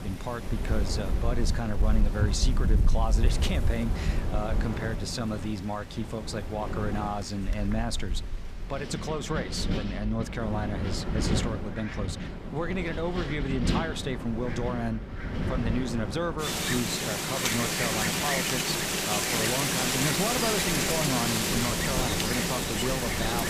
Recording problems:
wind in the background; very loud; throughout; 3 dB above the speech

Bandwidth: 15 kHz